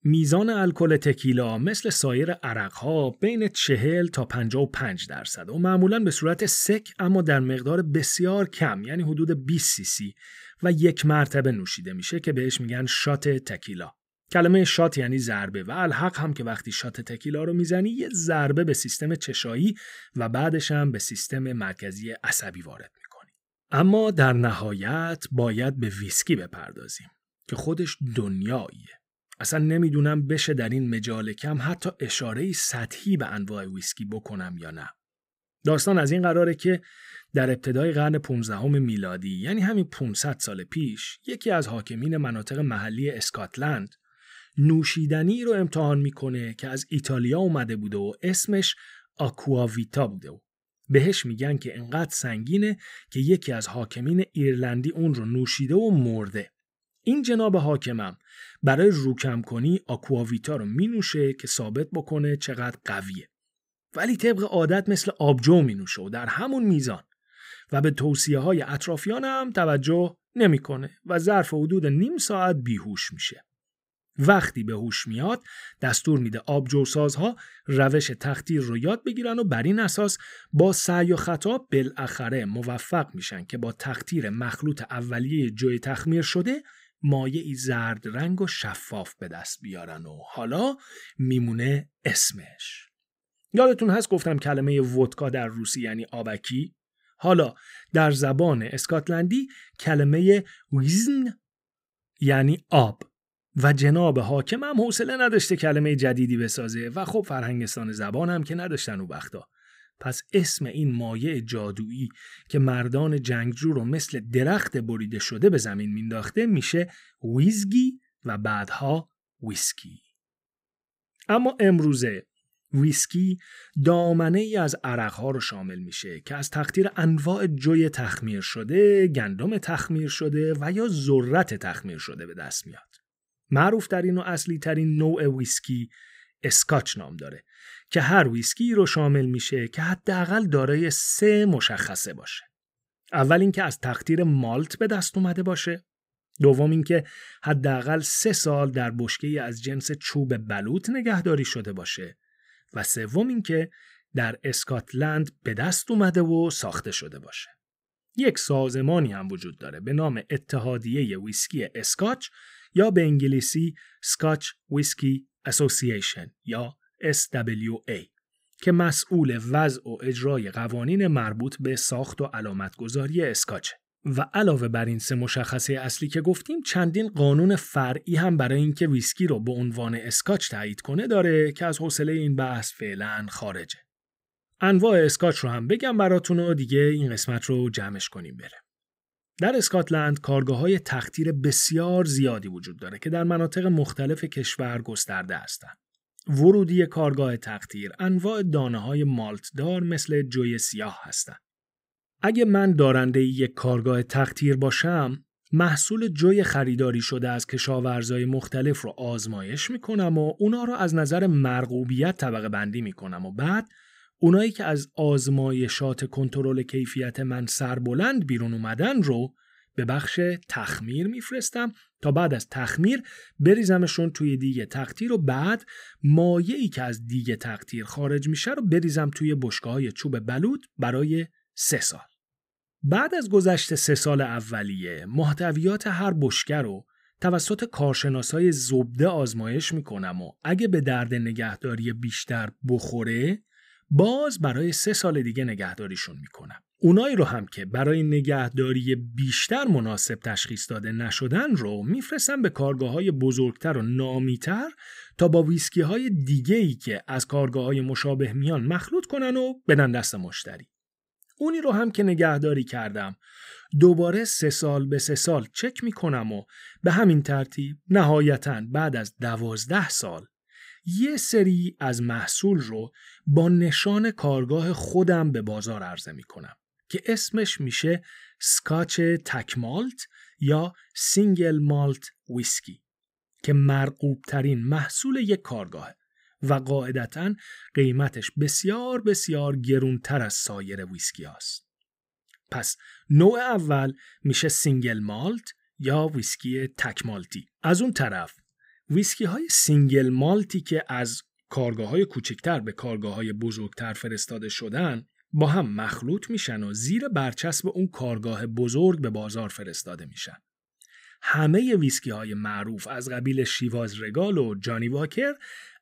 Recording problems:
none

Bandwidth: 15.5 kHz